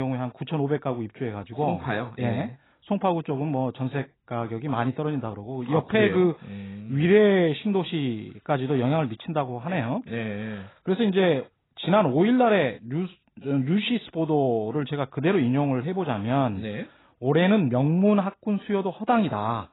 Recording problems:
garbled, watery; badly; nothing above 4 kHz
abrupt cut into speech; at the start

